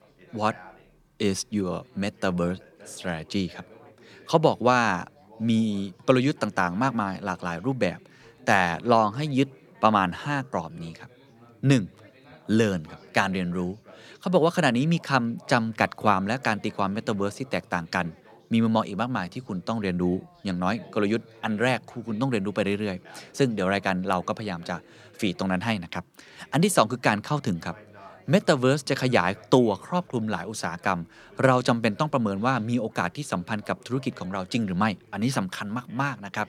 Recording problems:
background chatter; faint; throughout; 3 voices, 25 dB below the speech

